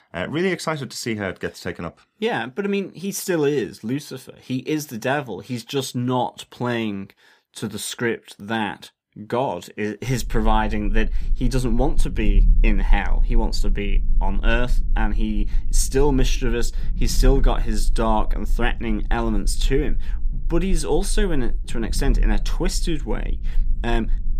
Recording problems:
low rumble; faint; from 10 s on; 25 dB below the speech

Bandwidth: 15 kHz